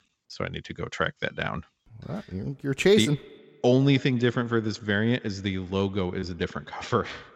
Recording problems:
echo of what is said; faint; from 2.5 s on; 110 ms later, 20 dB below the speech

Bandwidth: 16.5 kHz